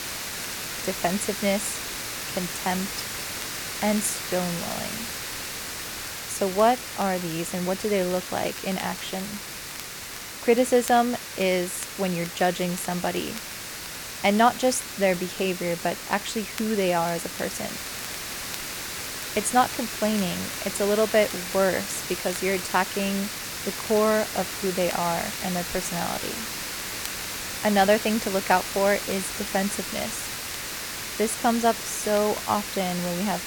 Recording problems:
hiss; loud; throughout; 6 dB below the speech
crackle, like an old record; faint; 20 dB below the speech

